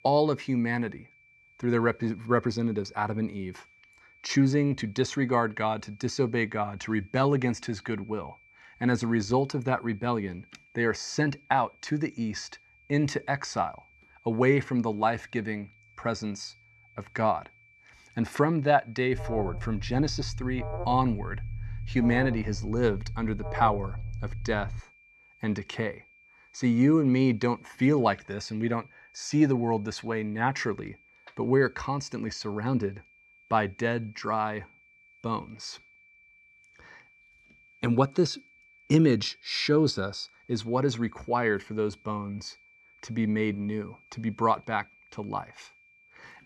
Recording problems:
high-pitched whine; faint; throughout; 2.5 kHz, 30 dB below the speech
alarm; noticeable; from 19 to 25 s; peak 7 dB below the speech

